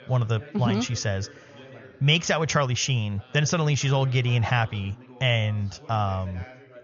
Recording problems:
high frequencies cut off; noticeable; nothing above 7 kHz
background chatter; faint; throughout; 4 voices, 20 dB below the speech

